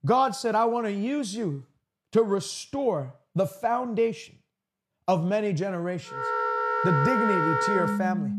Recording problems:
background music; very loud; from 6 s on; 1 dB above the speech

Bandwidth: 14 kHz